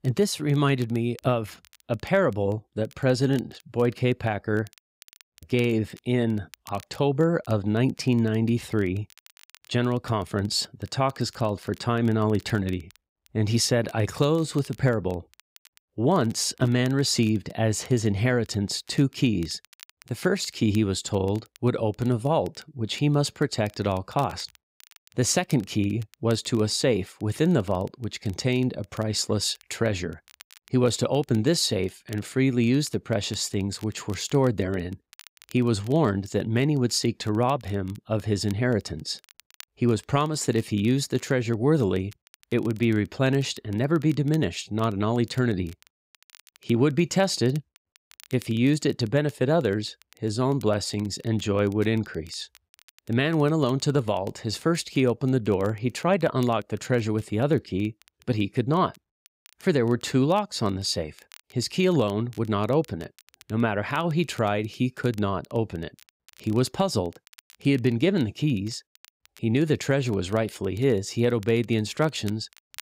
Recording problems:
crackle, like an old record; faint; 30 dB below the speech

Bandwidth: 15.5 kHz